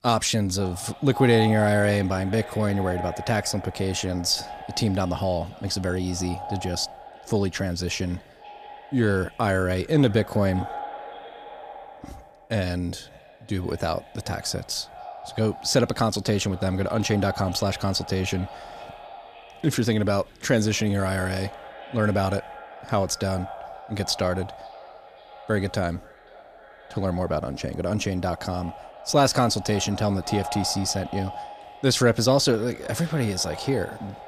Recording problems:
echo of what is said; noticeable; throughout; 530 ms later, 15 dB below the speech

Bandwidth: 14.5 kHz